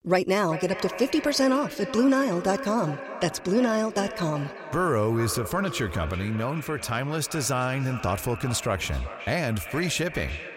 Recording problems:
echo of what is said; strong; throughout; 390 ms later, 10 dB below the speech

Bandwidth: 16 kHz